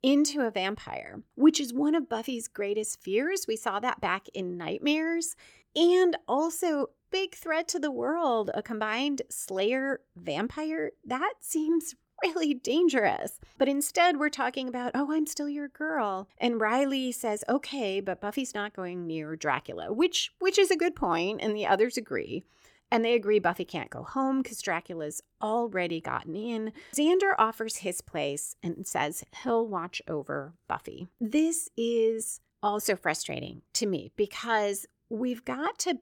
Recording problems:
none

